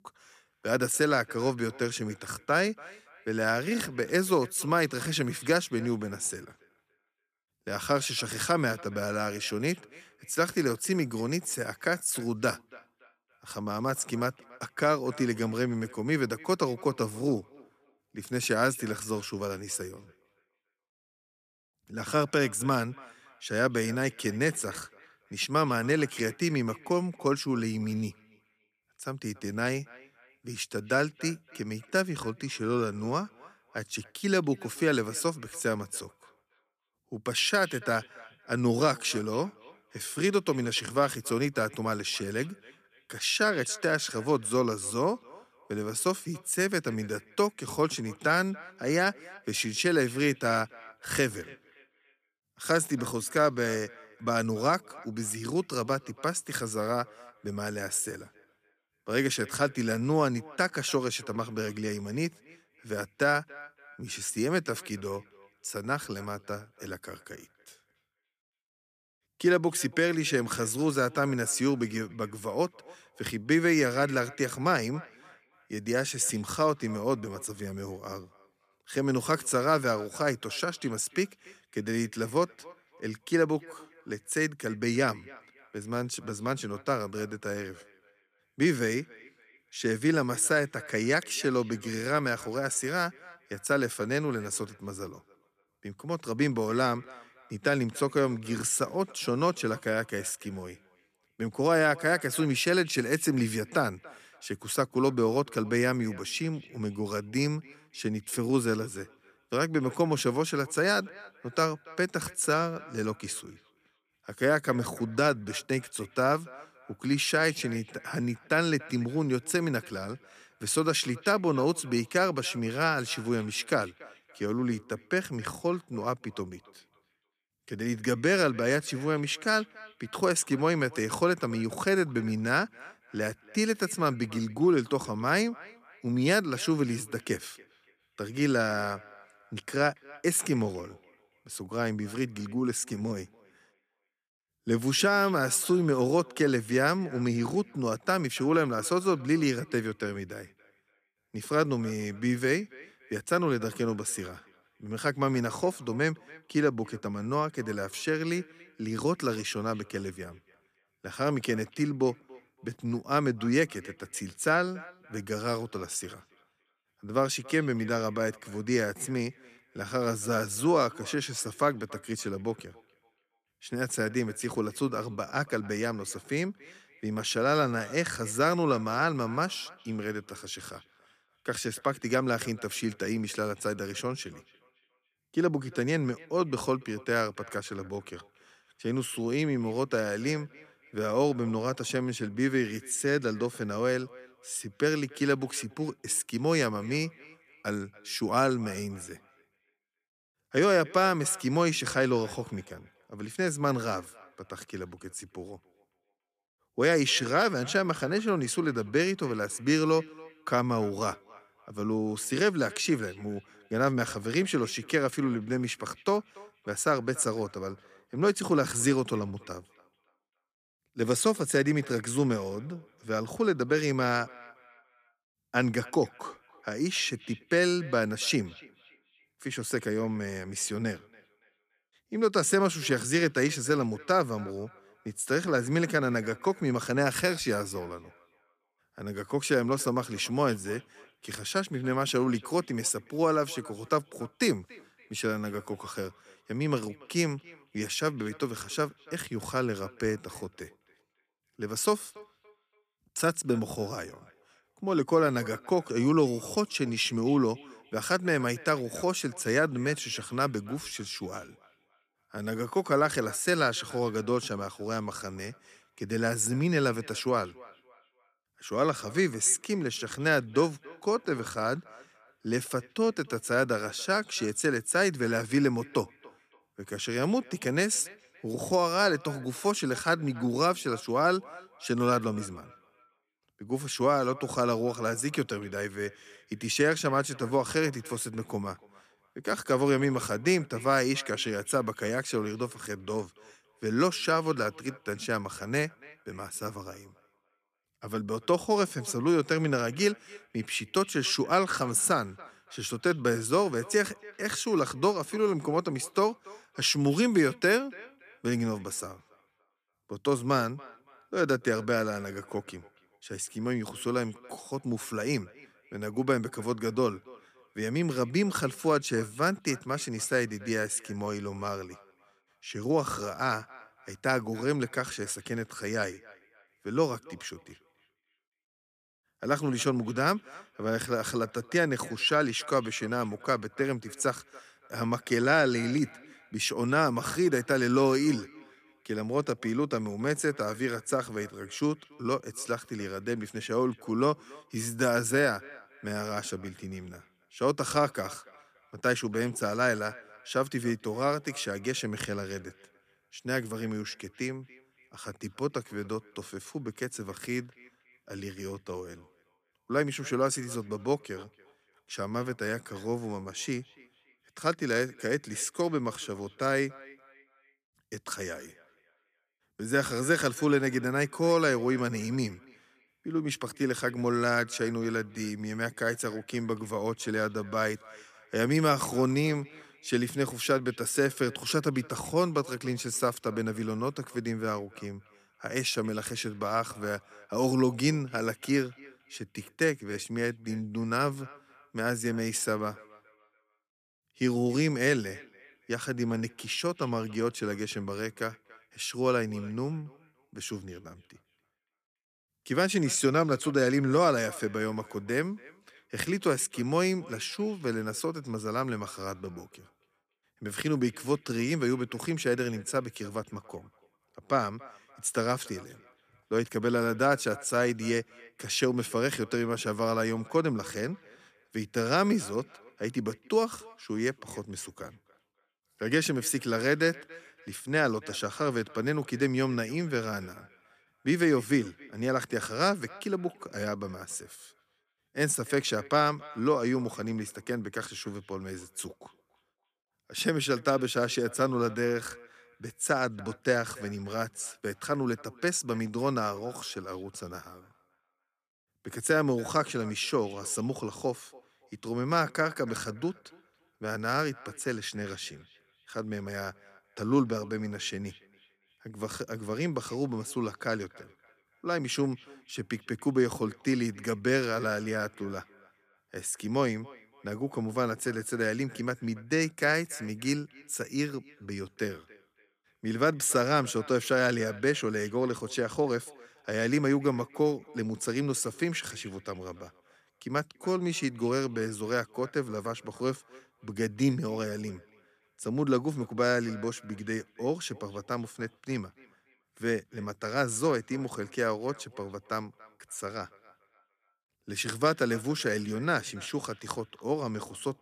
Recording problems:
echo of what is said; faint; throughout; 280 ms later, 25 dB below the speech

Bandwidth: 14.5 kHz